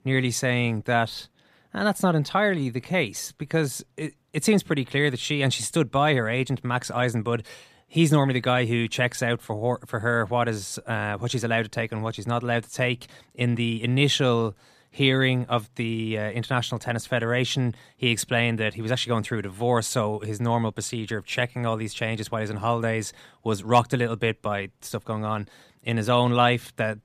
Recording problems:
none

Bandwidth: 14.5 kHz